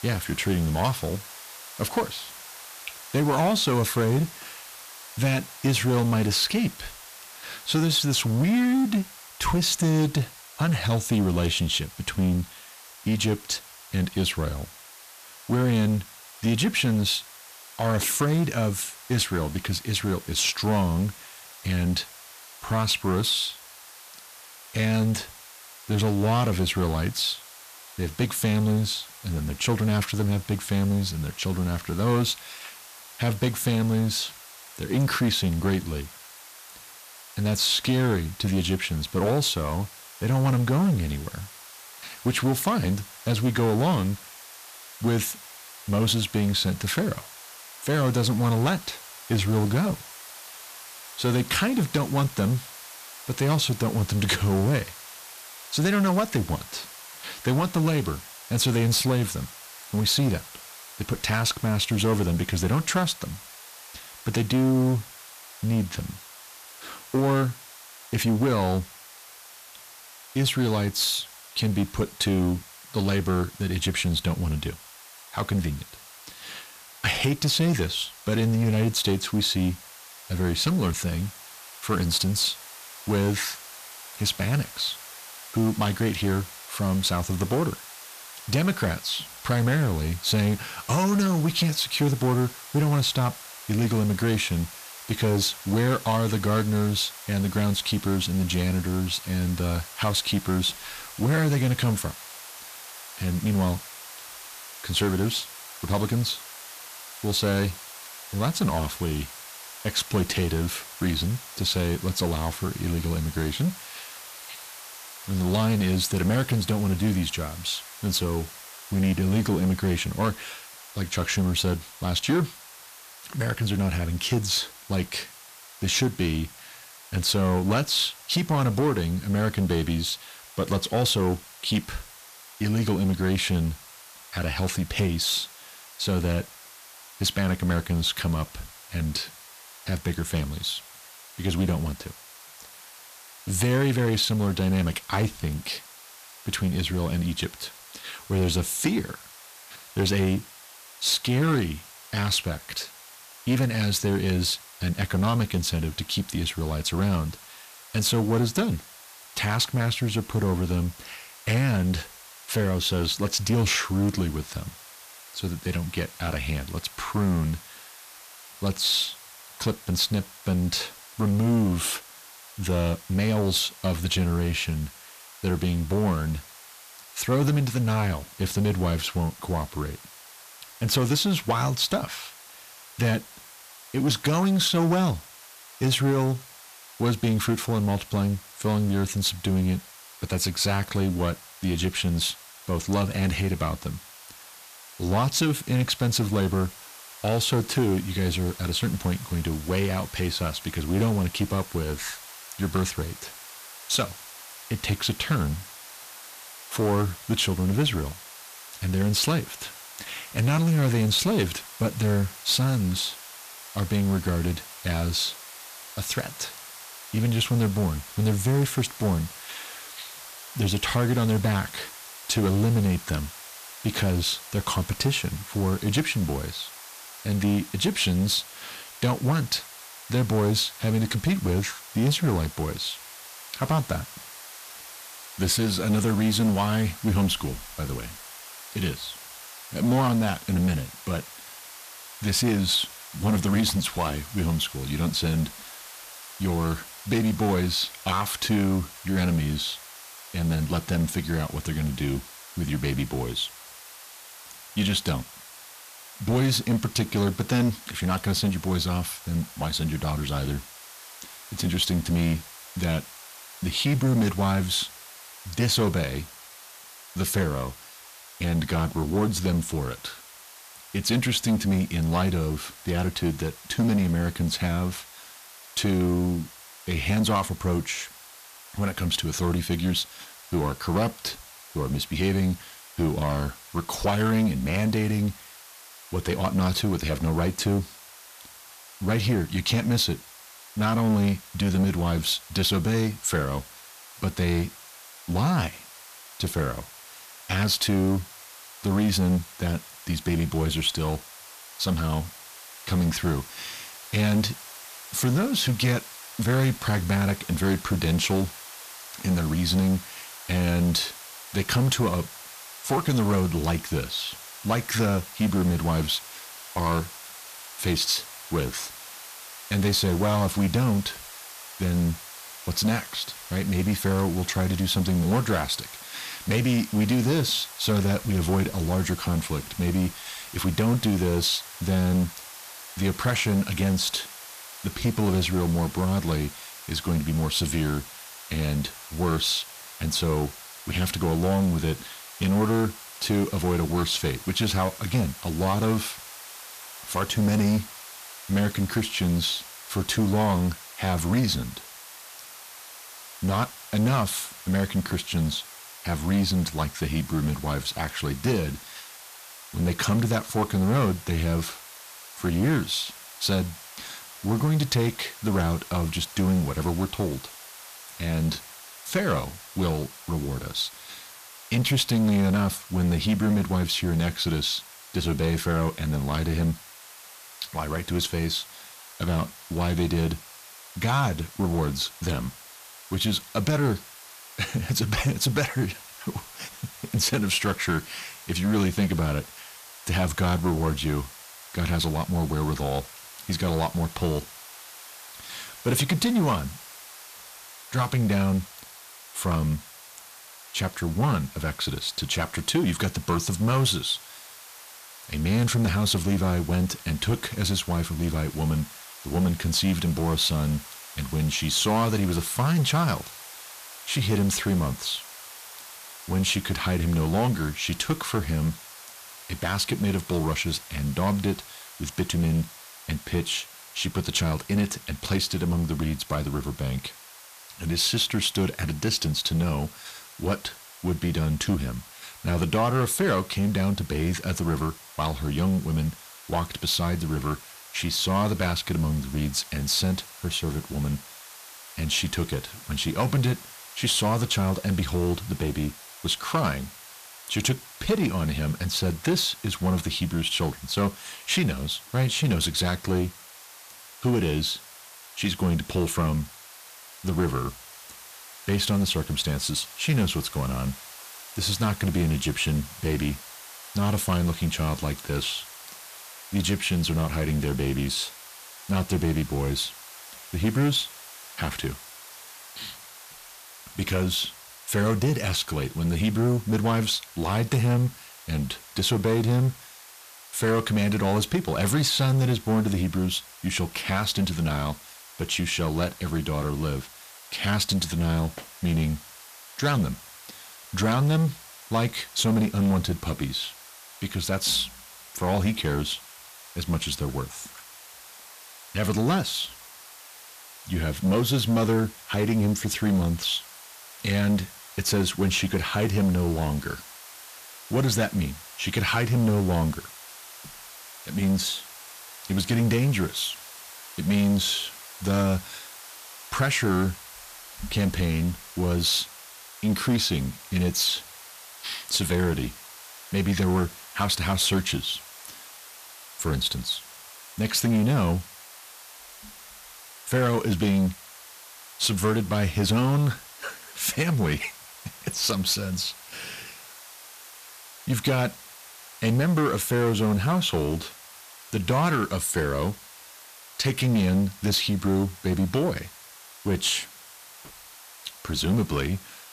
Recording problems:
distortion; slight; 10 dB below the speech
hiss; noticeable; throughout; 15 dB below the speech

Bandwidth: 14.5 kHz